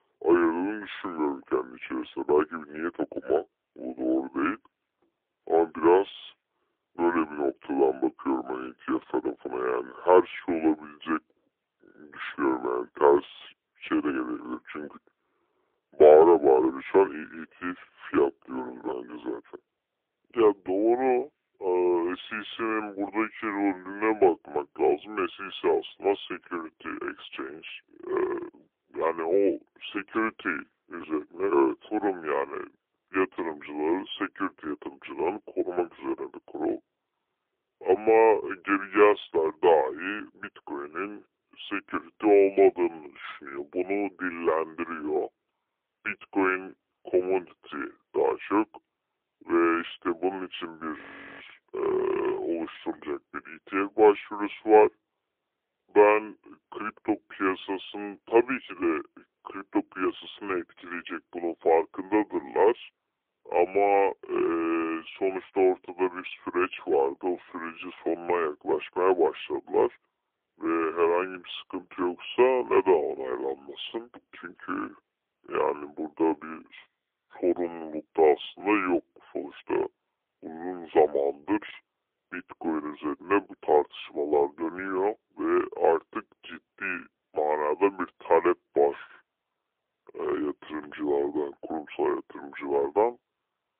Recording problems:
phone-call audio; poor line; nothing above 3.5 kHz
wrong speed and pitch; too slow and too low; 0.7 times normal speed
muffled; very slightly; fading above 3.5 kHz
audio freezing; at 51 s

